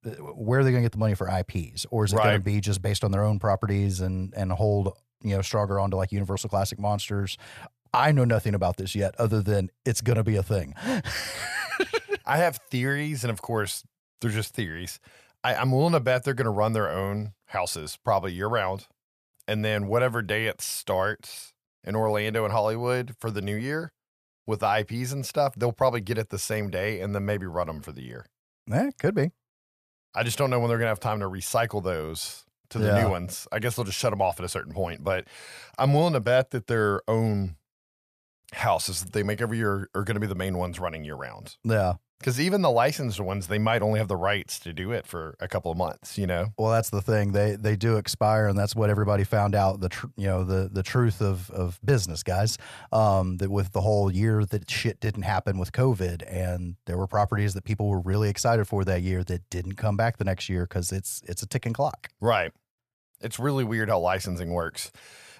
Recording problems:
none

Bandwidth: 14.5 kHz